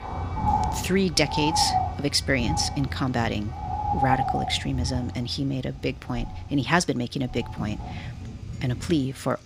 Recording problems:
animal sounds; loud; throughout; 4 dB below the speech
background music; faint; throughout; 25 dB below the speech

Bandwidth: 15.5 kHz